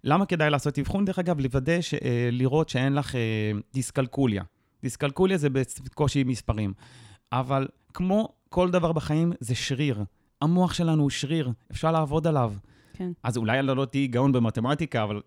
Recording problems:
none

